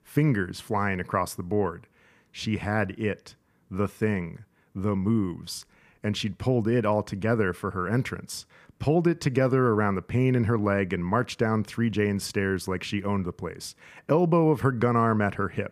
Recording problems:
none

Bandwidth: 15 kHz